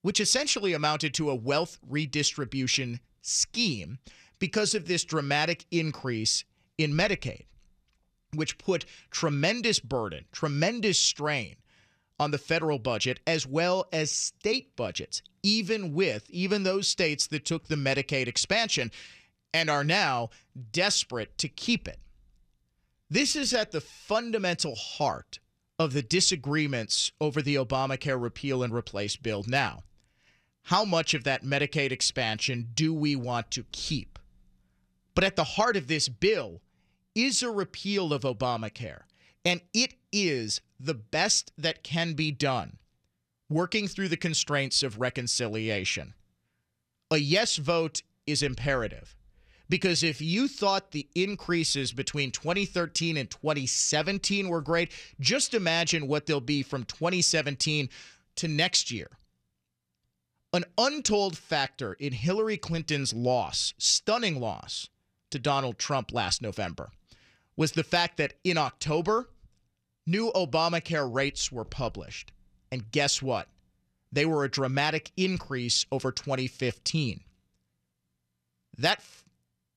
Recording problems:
uneven, jittery; strongly; from 4 to 50 s

